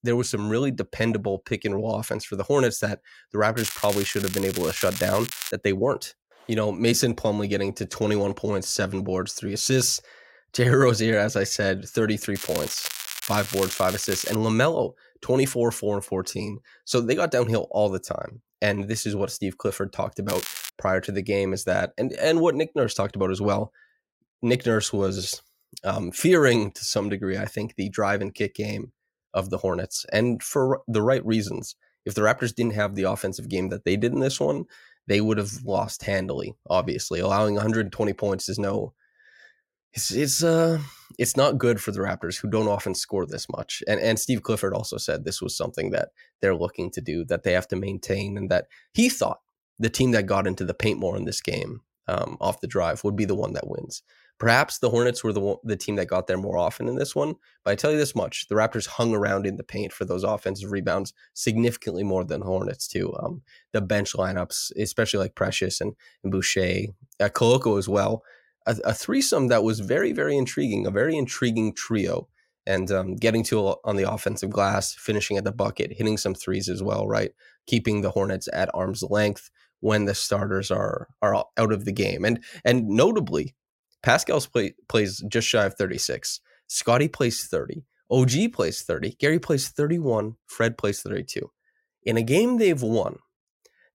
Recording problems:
crackling; loud; from 3.5 to 5.5 s, from 12 to 14 s and at 20 s; 7 dB below the speech

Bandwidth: 16 kHz